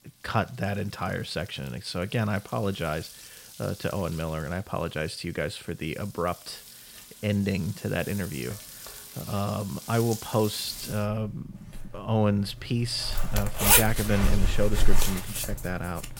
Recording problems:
household noises; very loud; throughout; 1 dB above the speech

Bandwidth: 16.5 kHz